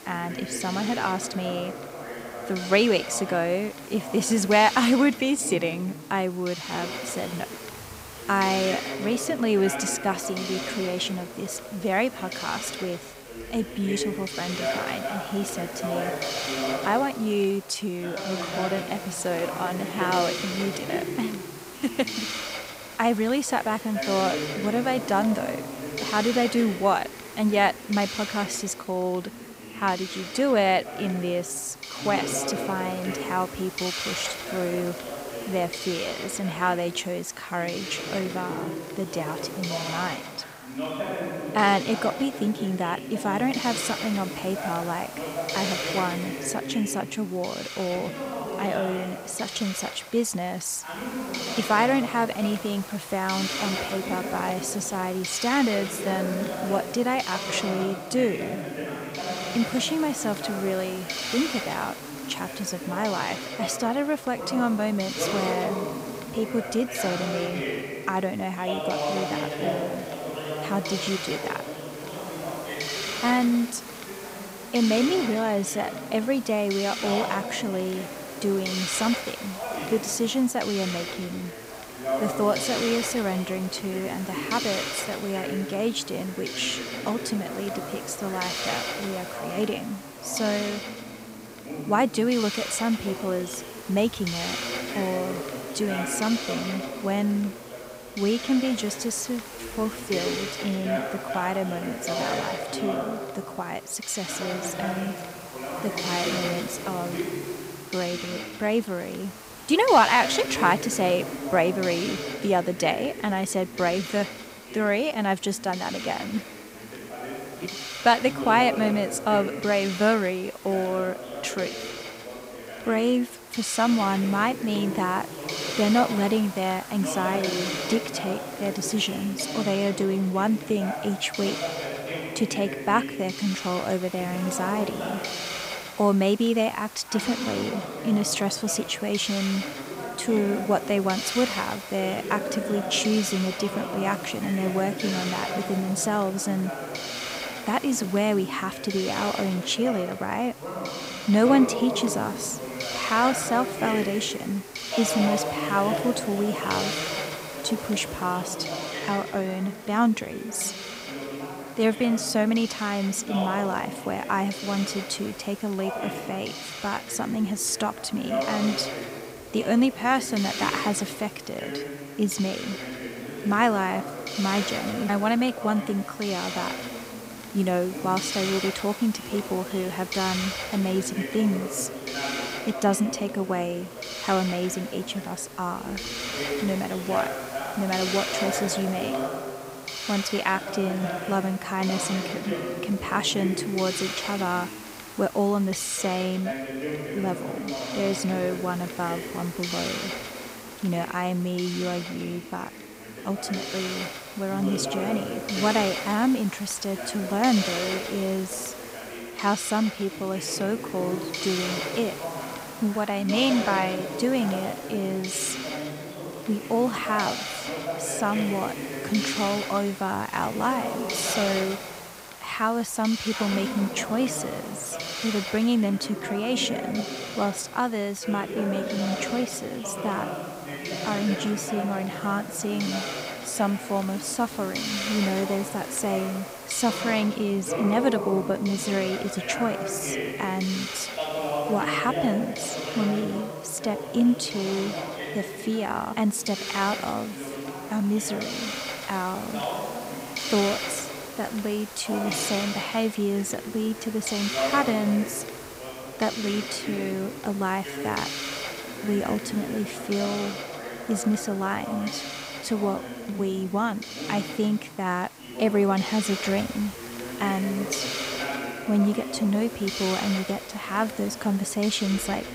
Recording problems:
voice in the background; loud; throughout; 8 dB below the speech
hiss; loud; throughout; 8 dB below the speech

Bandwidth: 15.5 kHz